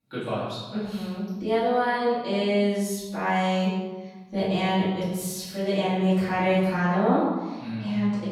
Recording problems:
room echo; strong; dies away in 1.2 s
off-mic speech; far

